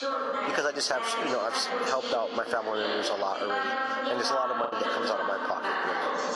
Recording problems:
thin; somewhat; fading below 400 Hz
garbled, watery; slightly; nothing above 11 kHz
squashed, flat; somewhat
background chatter; loud; throughout; 3 voices, as loud as the speech
choppy; occasionally; 2% of the speech affected

